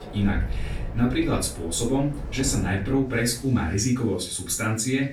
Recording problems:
off-mic speech; far
room echo; slight; dies away in 0.3 s
train or aircraft noise; noticeable; throughout; 15 dB below the speech
wind in the background; noticeable; throughout; 15 dB below the speech

